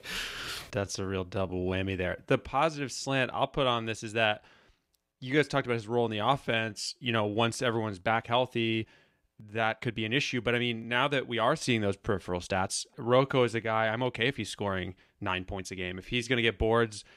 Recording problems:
uneven, jittery; strongly; from 0.5 to 16 s

